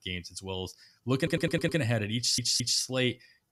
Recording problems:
audio stuttering; at 1 s and at 2 s

